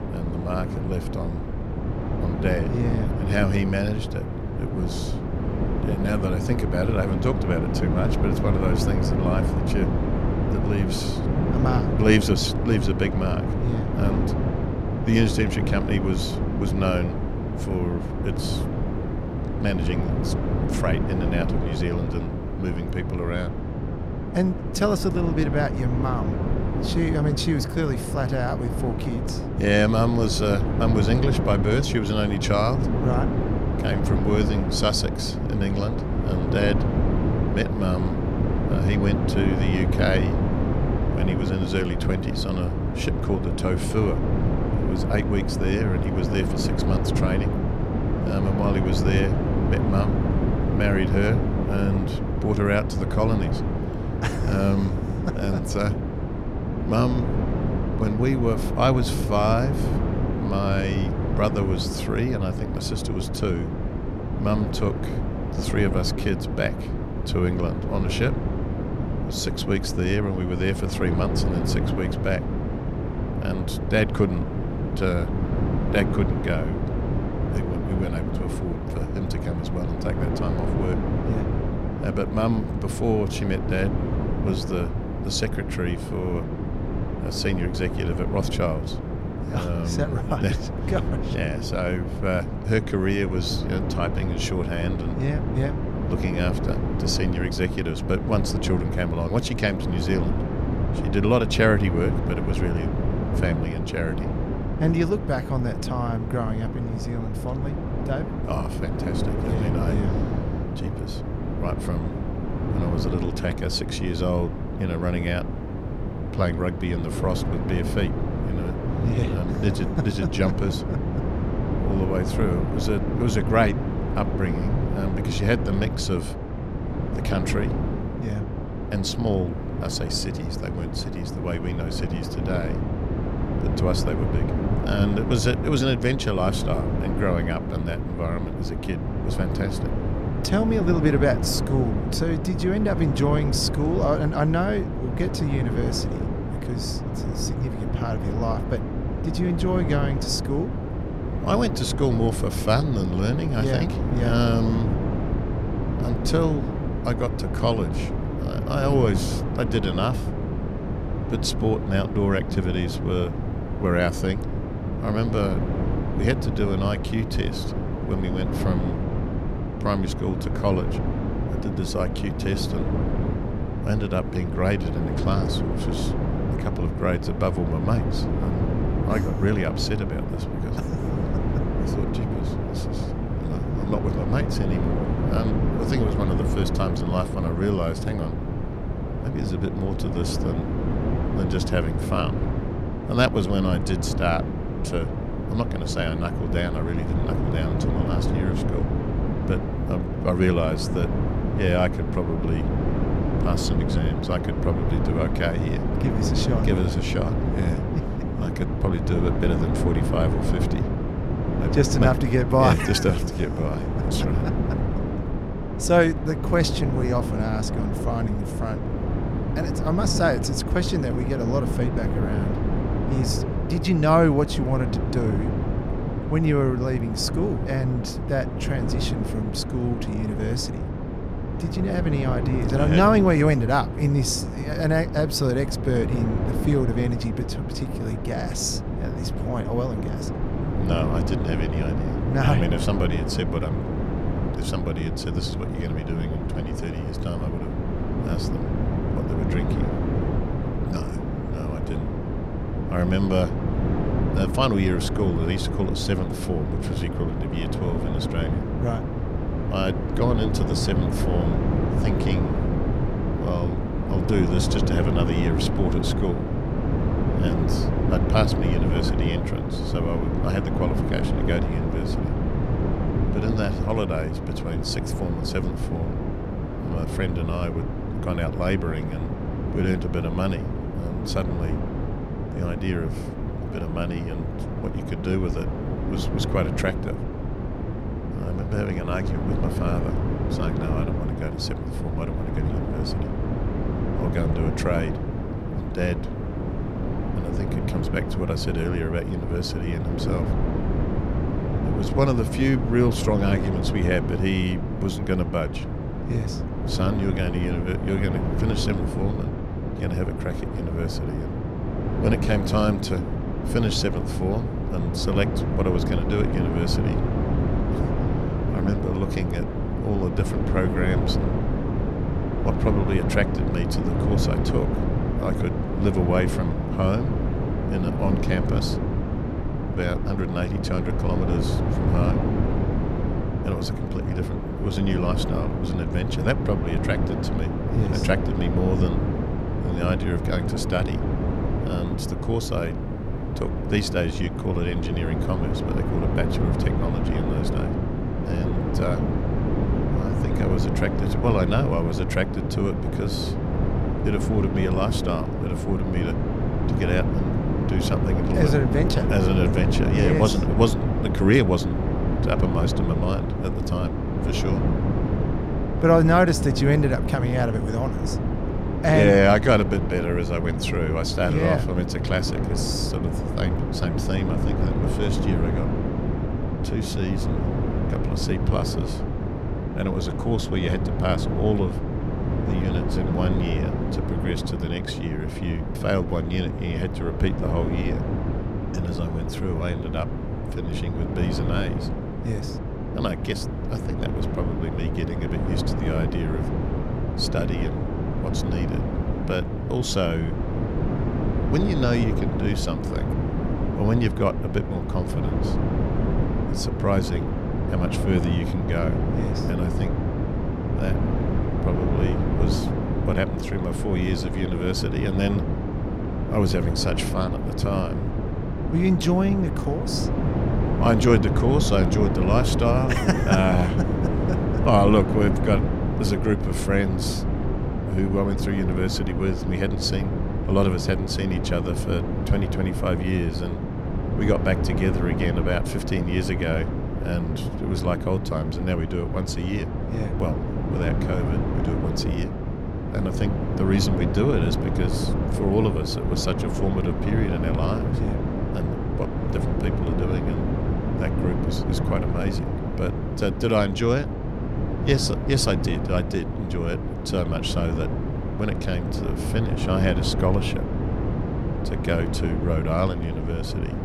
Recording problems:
wind noise on the microphone; heavy; 4 dB below the speech

